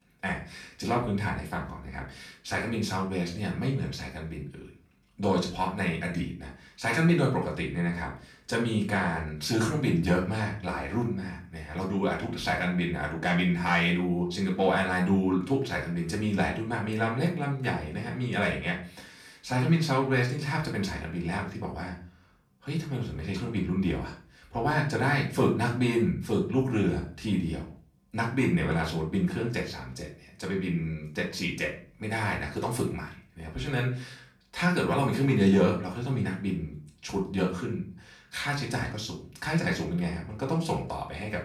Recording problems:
off-mic speech; far
room echo; slight; dies away in 0.4 s

